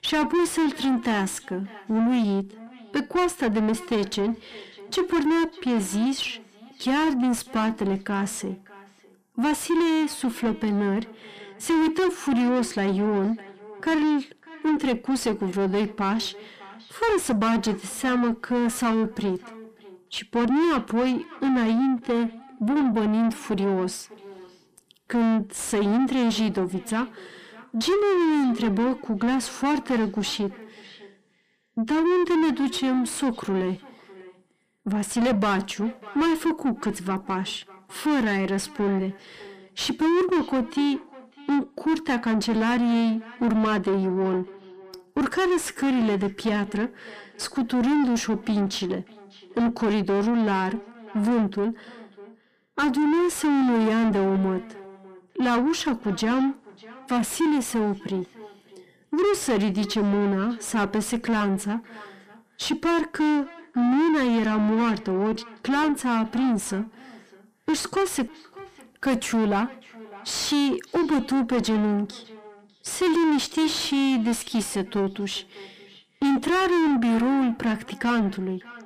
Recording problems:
distortion; heavy; 5 dB below the speech
echo of what is said; faint; throughout; 600 ms later, 20 dB below the speech

